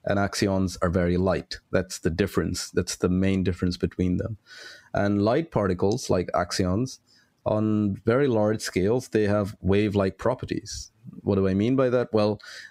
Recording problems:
squashed, flat; heavily

